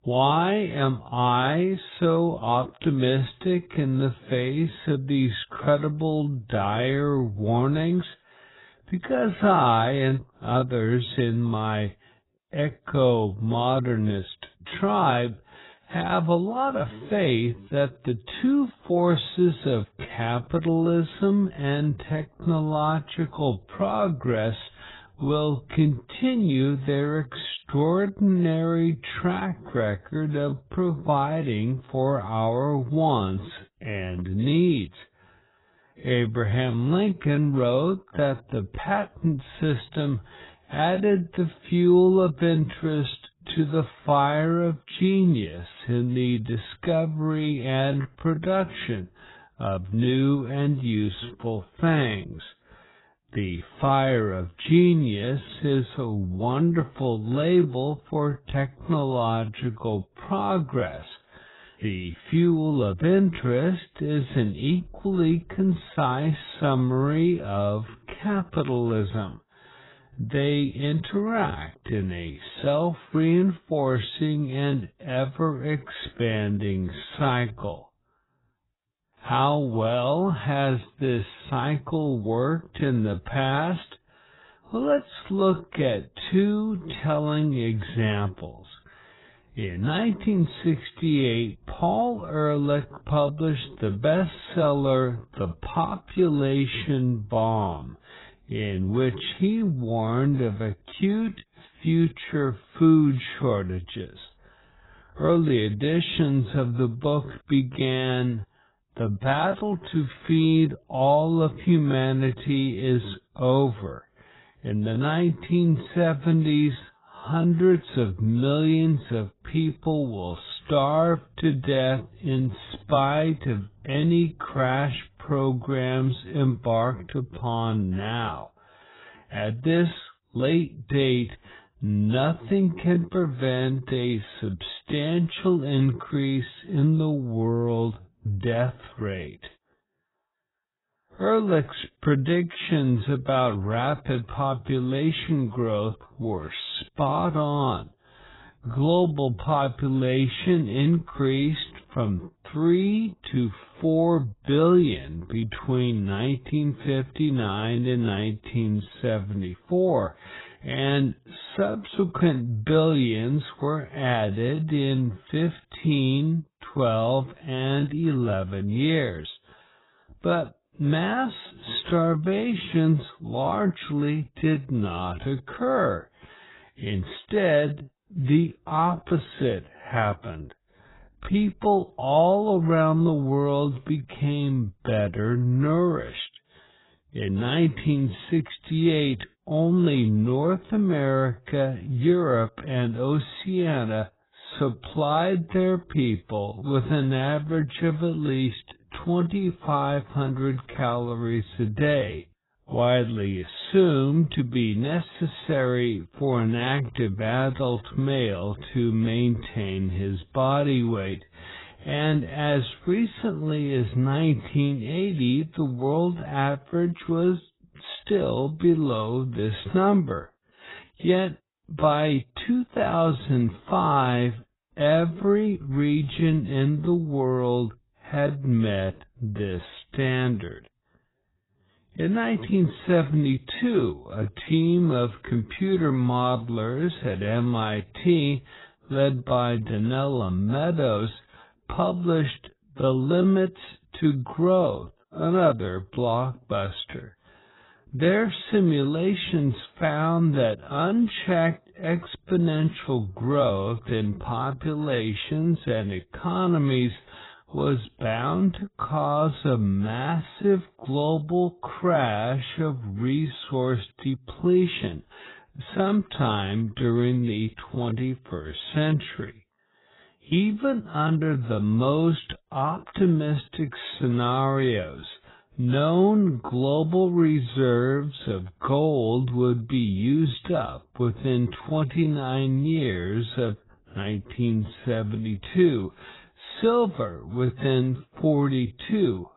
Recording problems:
garbled, watery; badly; nothing above 4 kHz
wrong speed, natural pitch; too slow; 0.5 times normal speed

